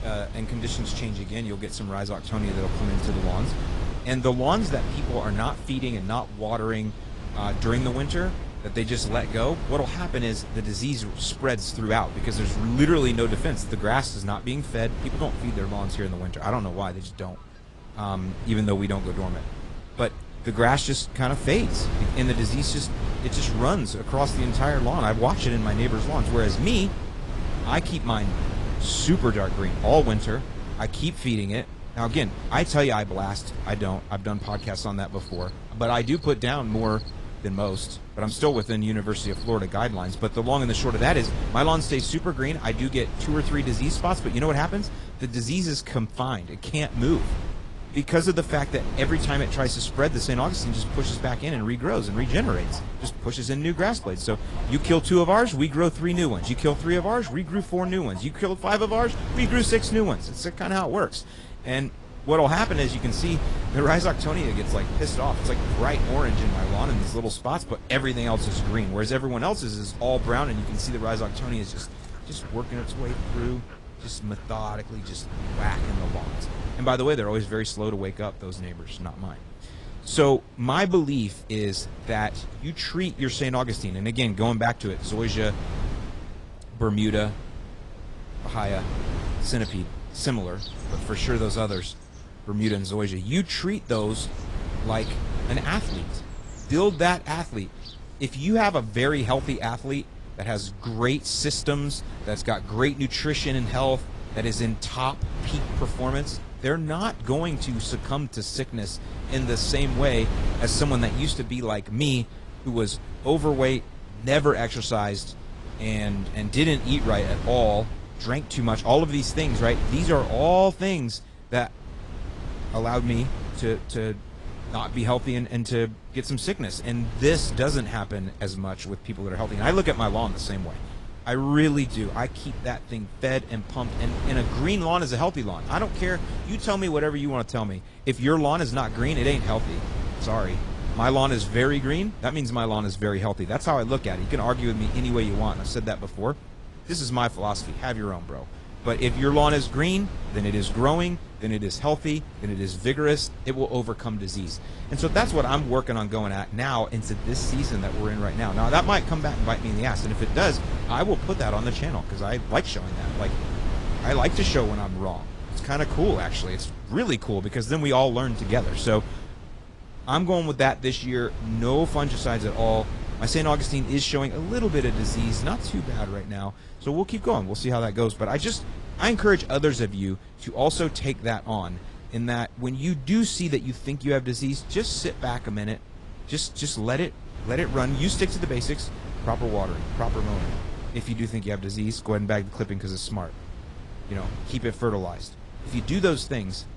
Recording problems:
garbled, watery; slightly; nothing above 10 kHz
wind noise on the microphone; occasional gusts; 15 dB below the speech
animal sounds; faint; until 1:40; 25 dB below the speech

